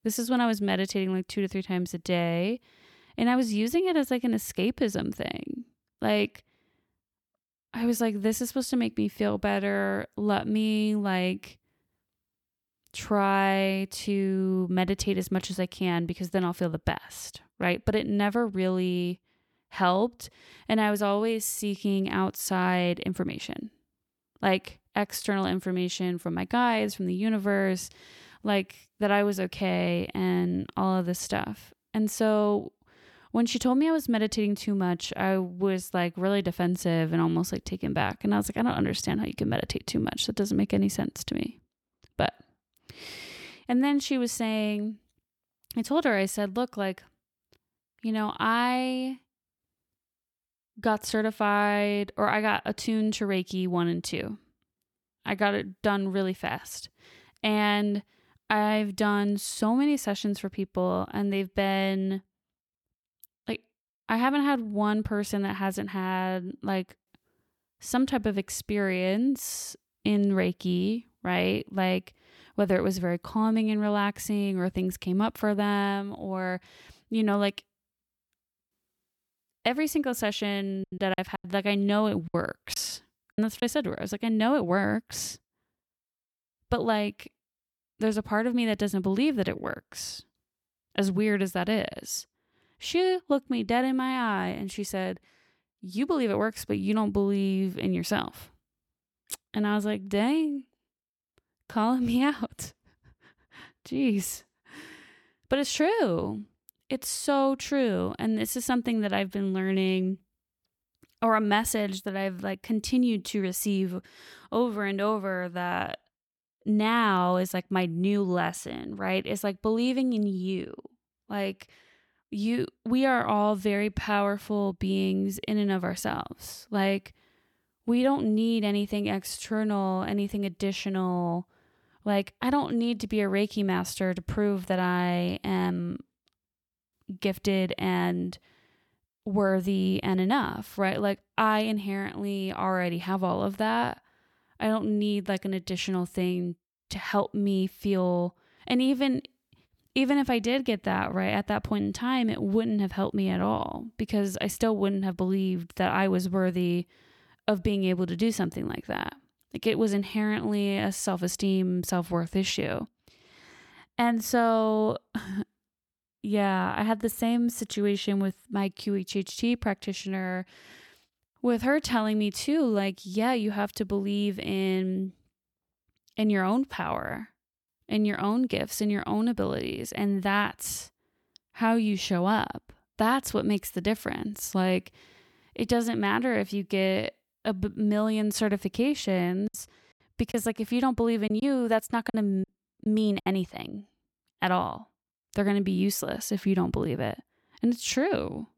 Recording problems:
choppy; very; from 1:21 to 1:24 and from 3:09 to 3:13; 10% of the speech affected

